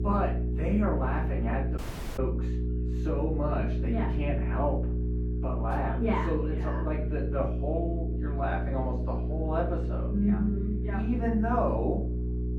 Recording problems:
off-mic speech; far
muffled; very; fading above 3 kHz
room echo; slight; dies away in 0.4 s
electrical hum; loud; throughout; 60 Hz, 9 dB below the speech
murmuring crowd; faint; throughout; 30 dB below the speech
audio cutting out; at 2 s

